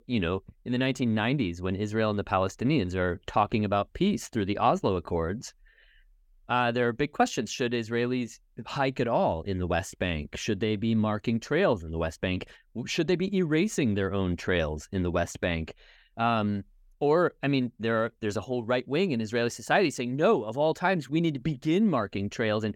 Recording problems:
none

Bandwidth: 17 kHz